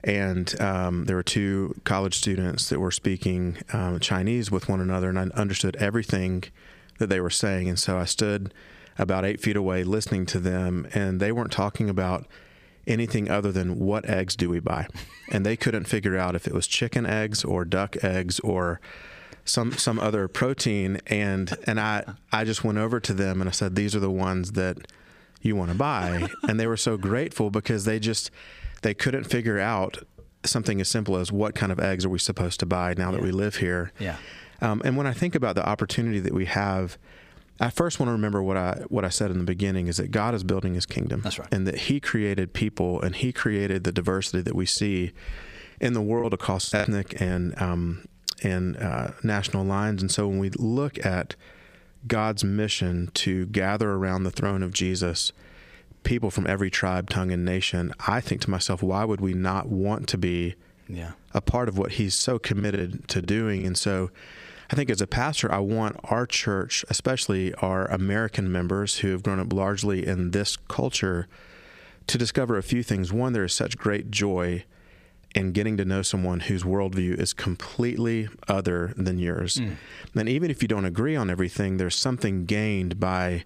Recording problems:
squashed, flat; heavily
choppy; very; at 46 s and from 1:03 to 1:04; 9% of the speech affected

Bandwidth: 15 kHz